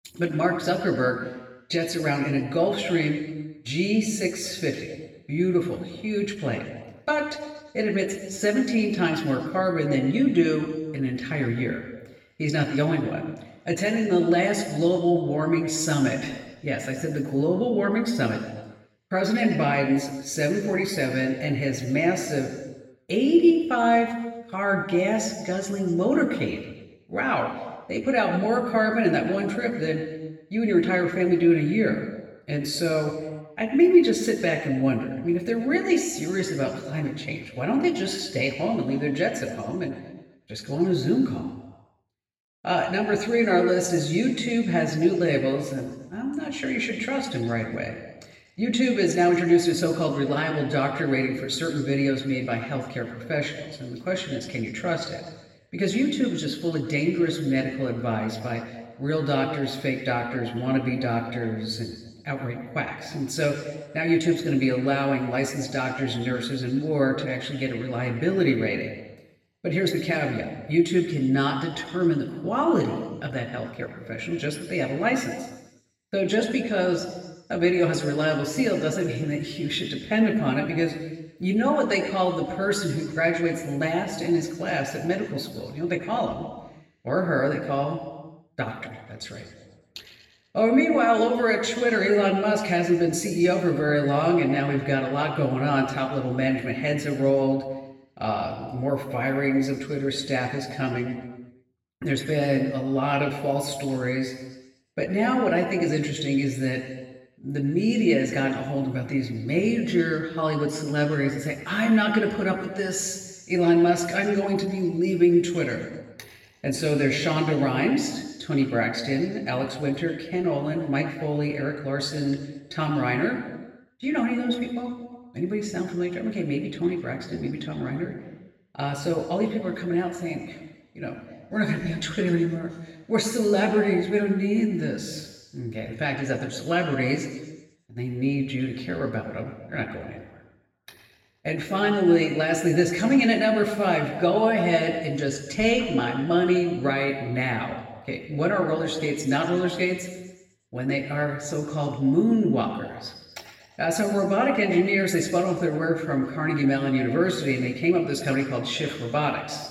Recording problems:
off-mic speech; far
room echo; noticeable; dies away in 1.2 s

